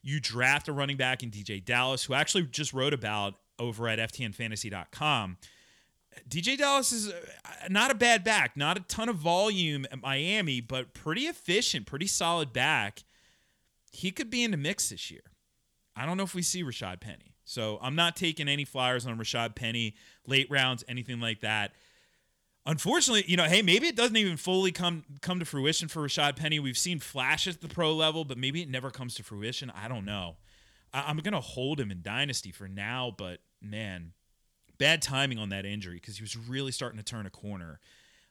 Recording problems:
none

